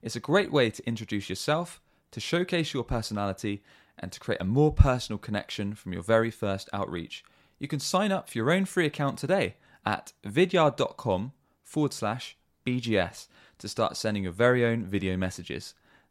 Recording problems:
none

